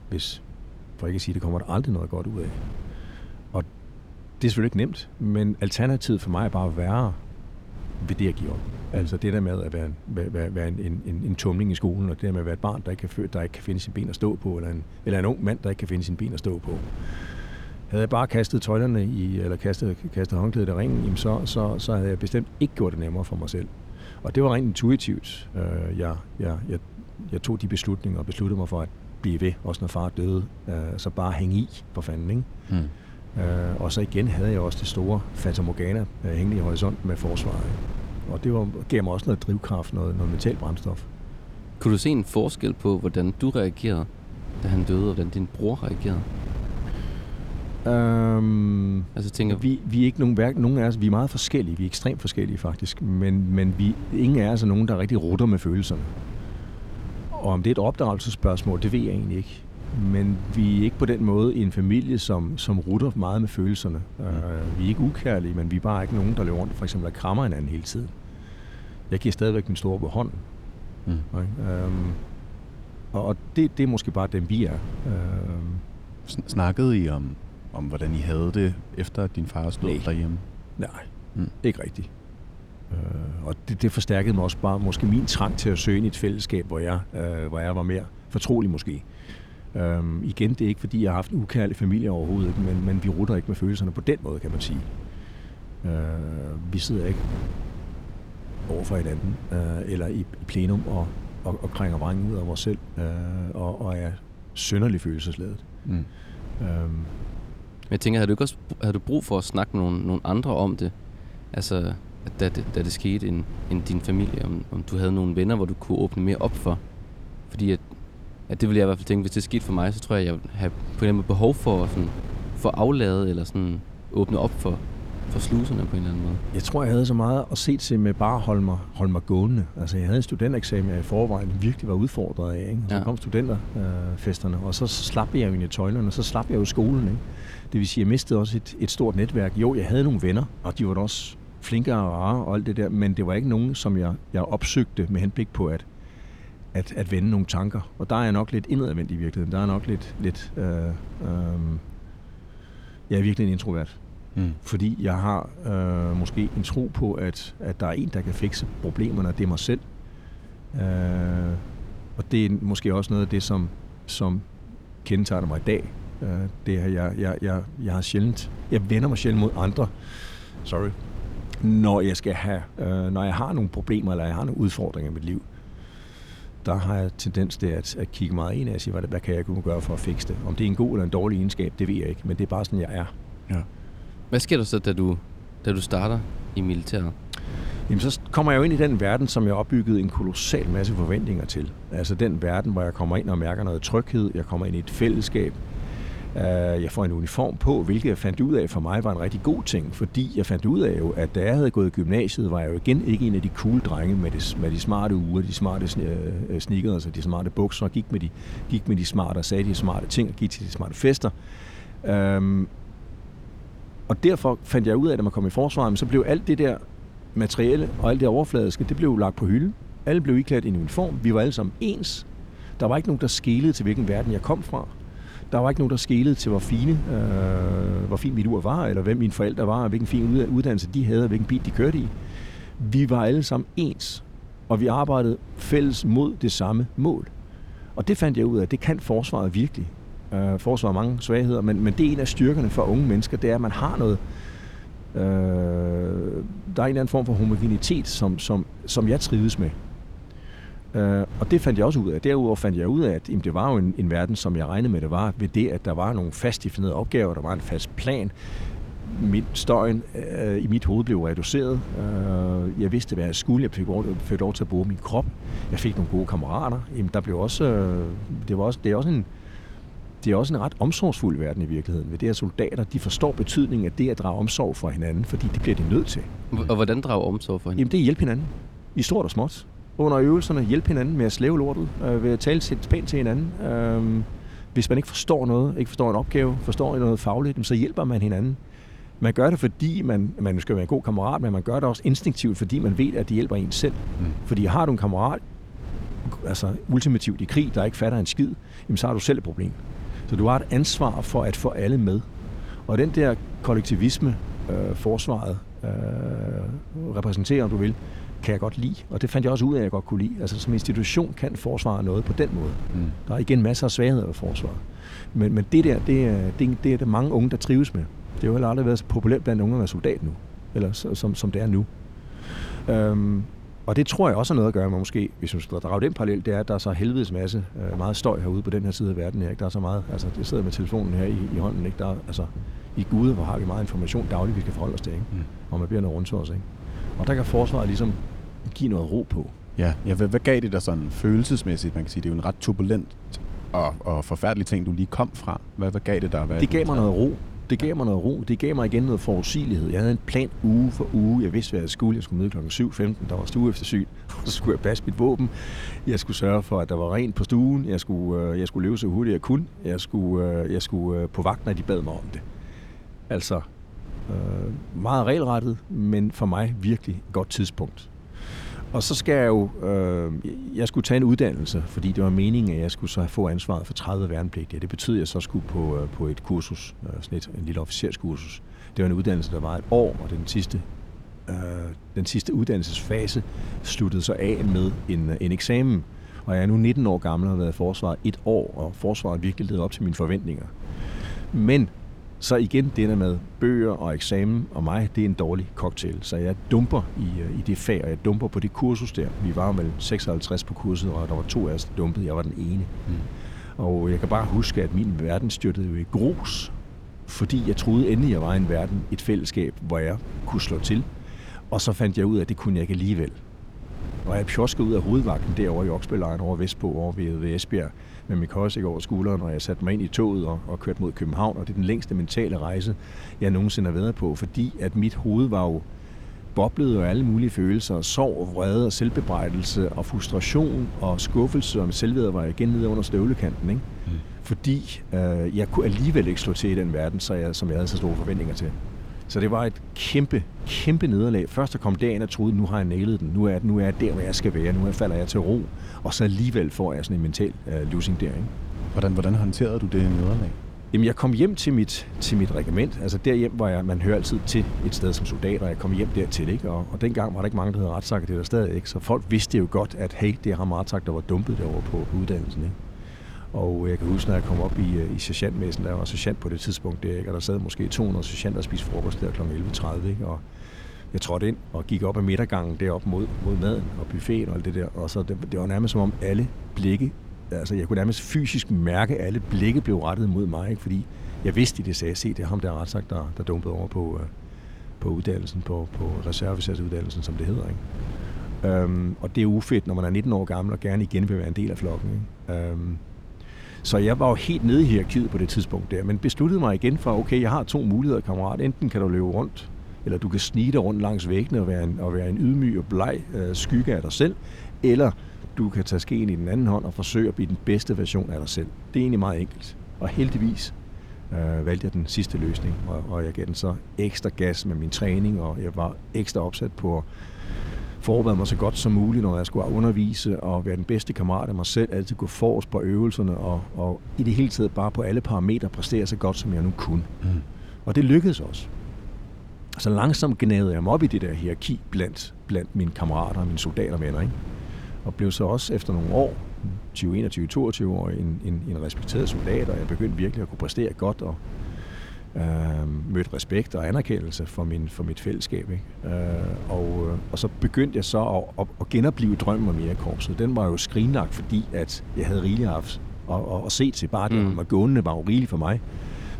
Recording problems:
wind noise on the microphone; occasional gusts; 20 dB below the speech

